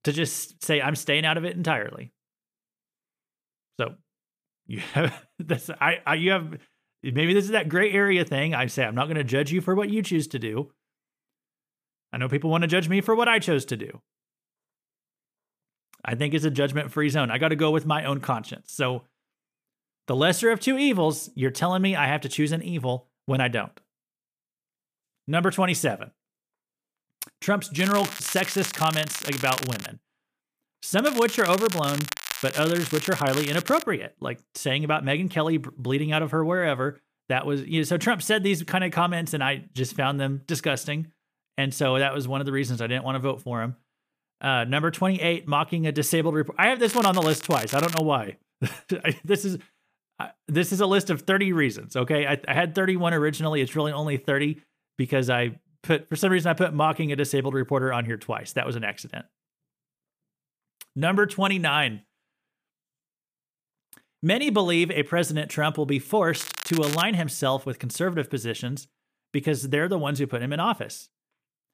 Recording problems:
crackling; loud; 4 times, first at 28 s; 8 dB below the speech

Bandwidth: 15 kHz